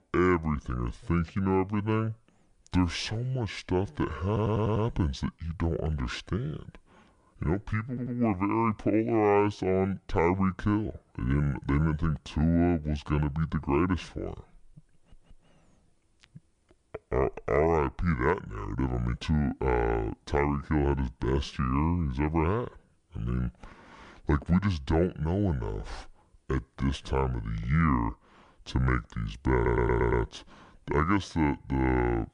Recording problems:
wrong speed and pitch; too slow and too low; 0.7 times normal speed
audio stuttering; 4 times, first at 4.5 s

